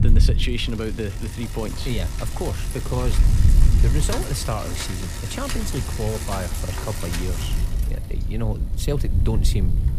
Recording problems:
traffic noise; loud; throughout; 5 dB below the speech
wind noise on the microphone; occasional gusts; 10 dB below the speech
chatter from many people; faint; throughout; 30 dB below the speech

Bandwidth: 15 kHz